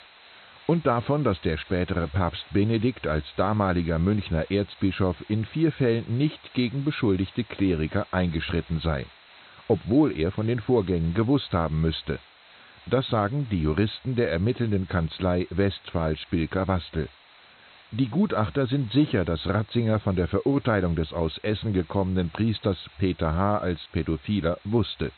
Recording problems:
high frequencies cut off; severe; nothing above 4 kHz
hiss; faint; throughout; 25 dB below the speech

